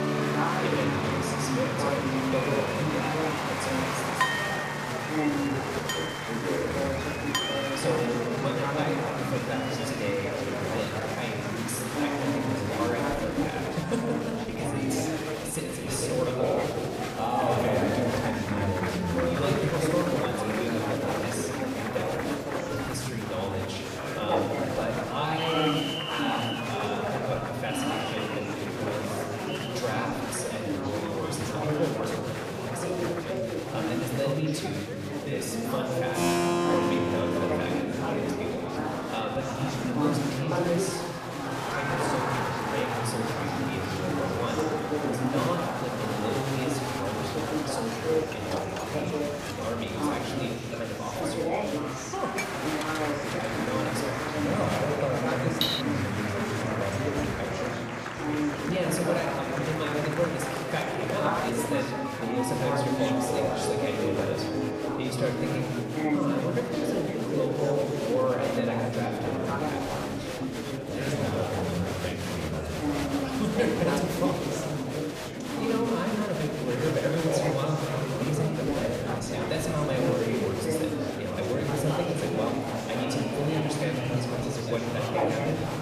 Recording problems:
room echo; noticeable; dies away in 1.8 s
off-mic speech; somewhat distant
murmuring crowd; very loud; throughout; 1 dB above the speech
background music; loud; throughout; 7 dB below the speech
clattering dishes; loud; from 4 to 7.5 s and at 56 s; peak 5 dB above the speech
clattering dishes; noticeable; from 47 to 54 s; peak 3 dB below the speech

